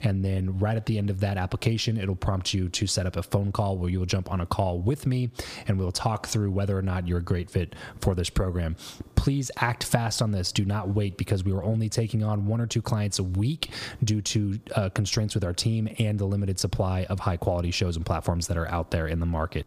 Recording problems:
squashed, flat; somewhat

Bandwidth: 15 kHz